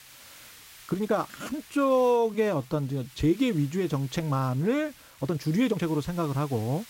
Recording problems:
hiss; faint; throughout; 20 dB below the speech
uneven, jittery; strongly; from 1 to 6 s

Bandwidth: 16 kHz